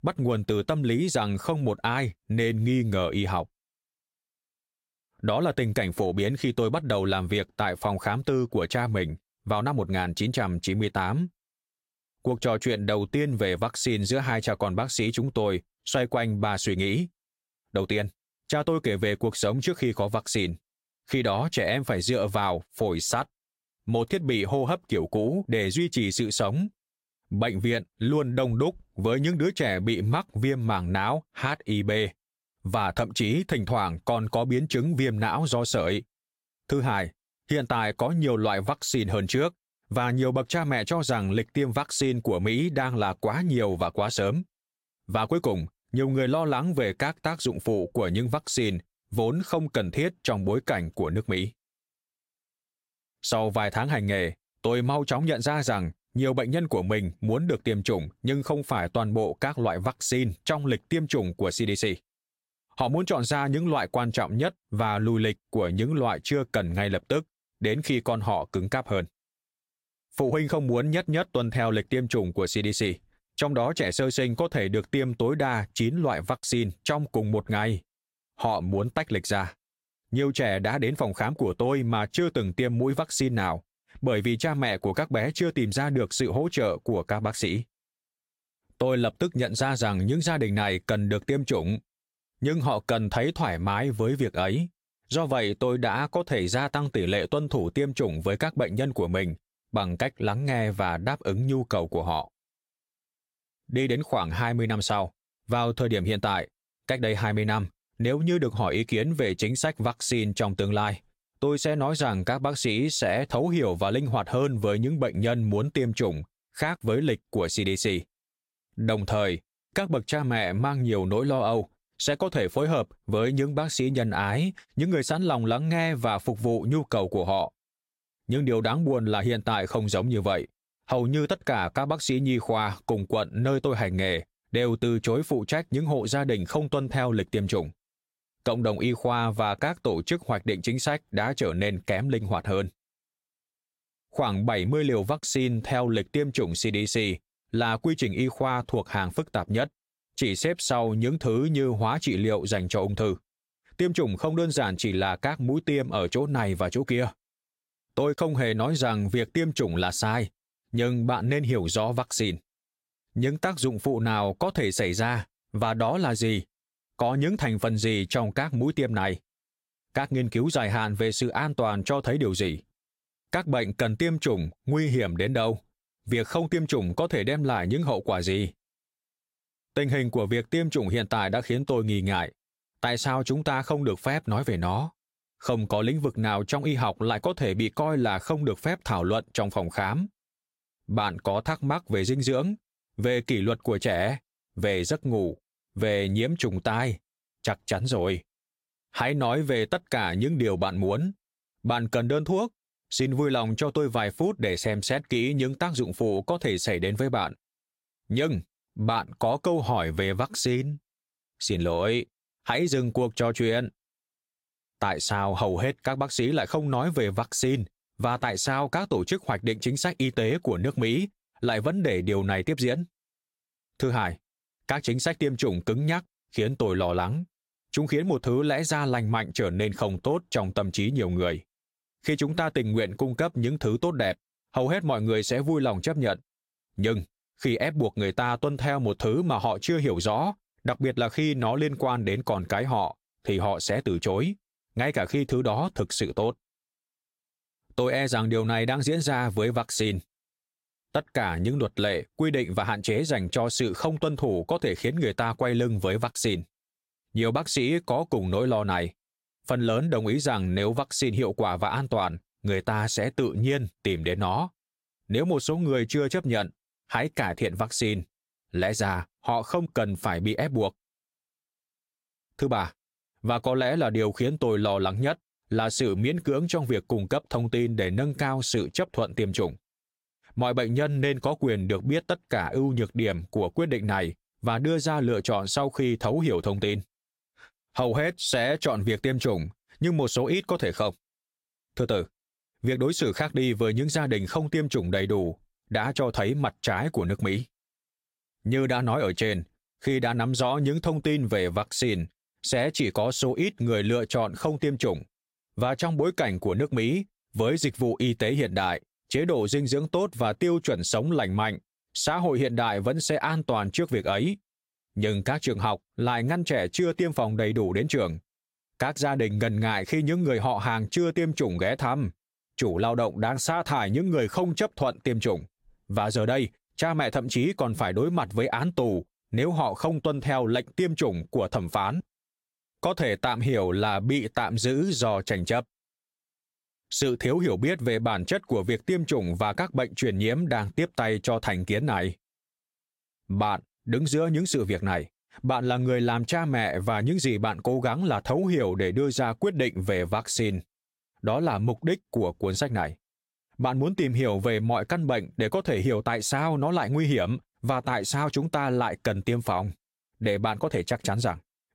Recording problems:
squashed, flat; somewhat

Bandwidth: 16 kHz